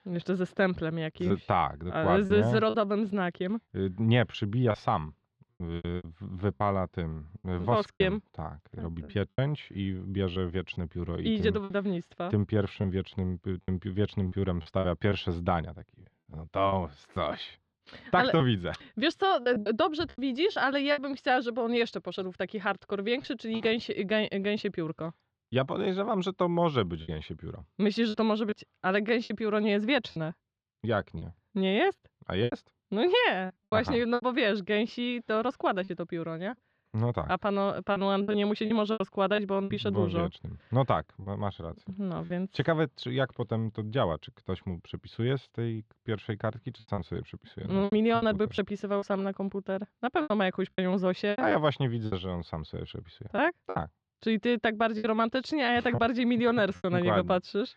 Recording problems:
muffled; very slightly; fading above 4 kHz
choppy; very; 7% of the speech affected

